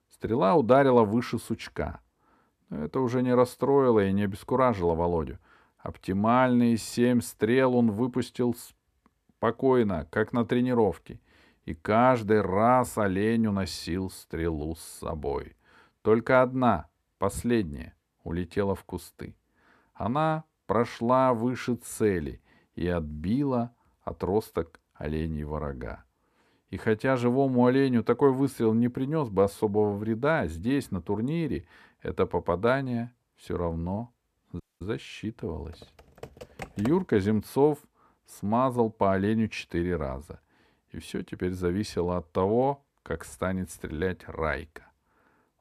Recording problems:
audio cutting out; at 35 s
keyboard typing; faint; from 36 to 37 s; peak 15 dB below the speech

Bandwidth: 14.5 kHz